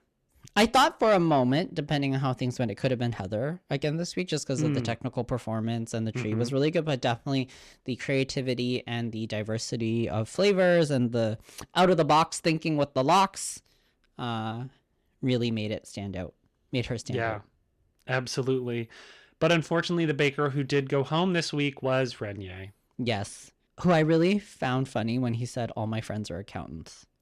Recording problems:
distortion; slight; 10 dB below the speech

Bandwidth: 14 kHz